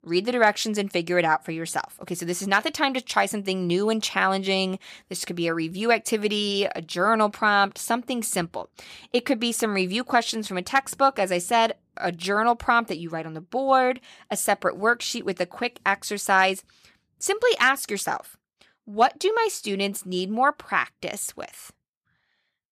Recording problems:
none

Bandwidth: 14.5 kHz